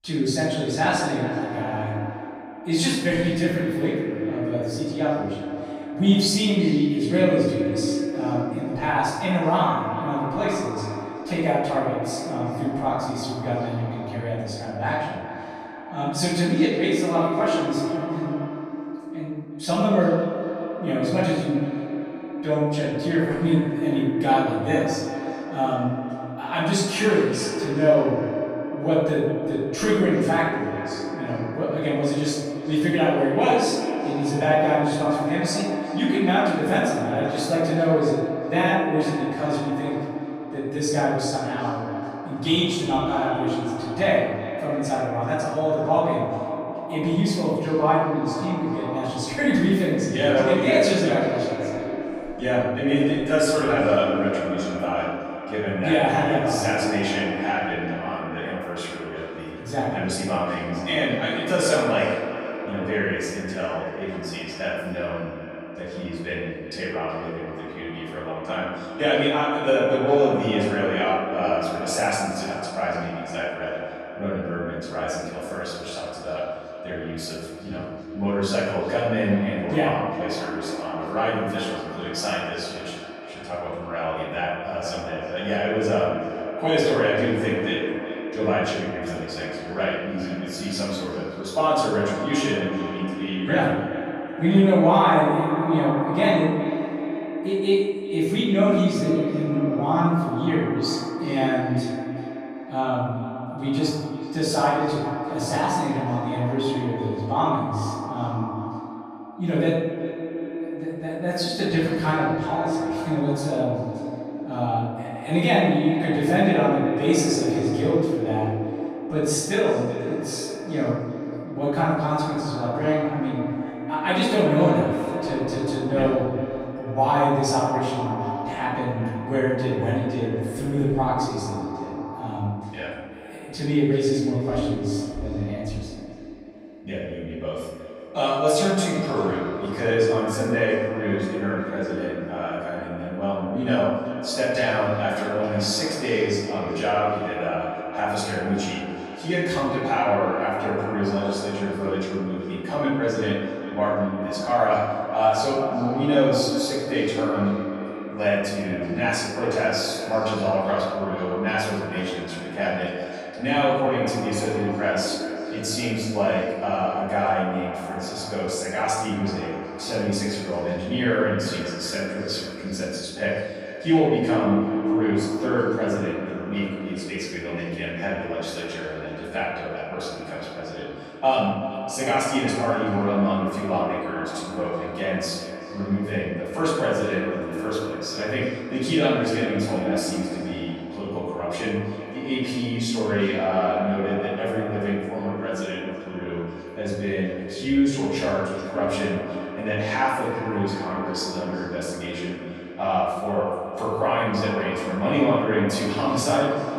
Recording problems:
echo of what is said; strong; throughout; 380 ms later, 7 dB below the speech
off-mic speech; far
room echo; noticeable; dies away in 1 s

